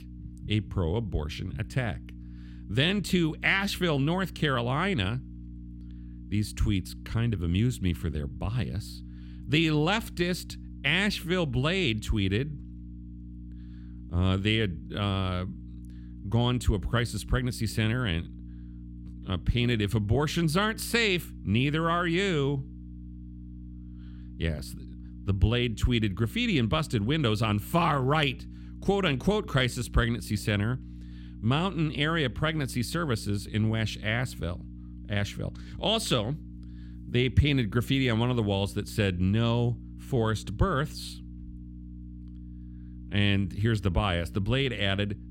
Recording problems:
electrical hum; faint; throughout; 60 Hz, 25 dB below the speech

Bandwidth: 16.5 kHz